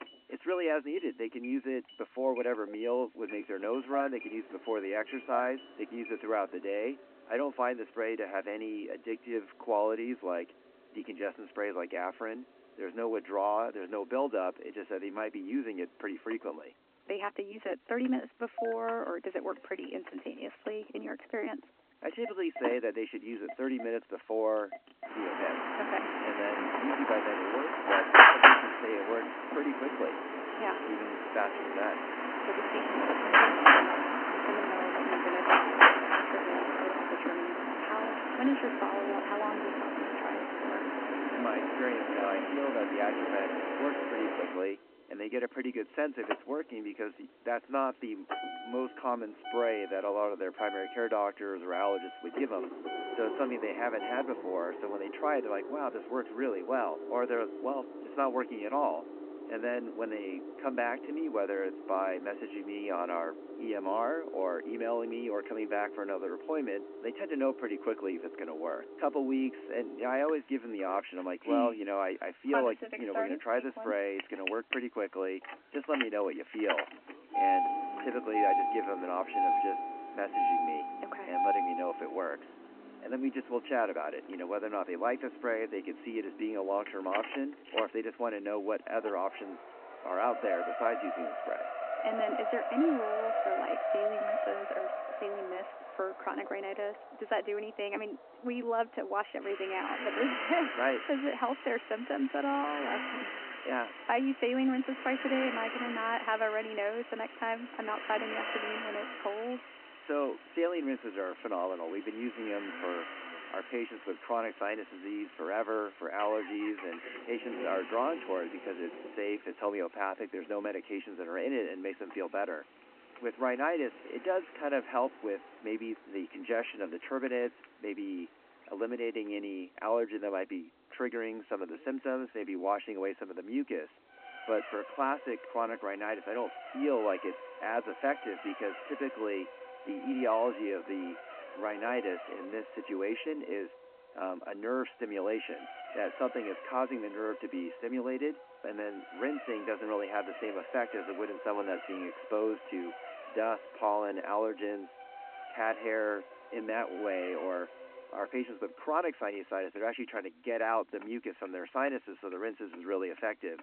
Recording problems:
phone-call audio
traffic noise; very loud; throughout; 3 dB above the speech

